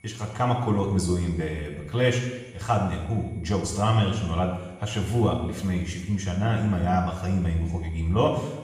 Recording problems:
off-mic speech; far
room echo; noticeable; dies away in 1.1 s
high-pitched whine; faint; throughout; 2 kHz, 30 dB below the speech

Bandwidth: 14.5 kHz